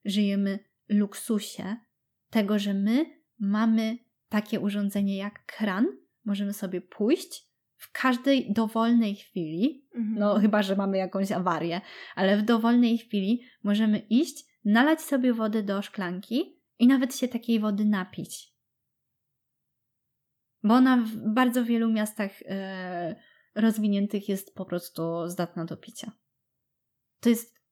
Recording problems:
none

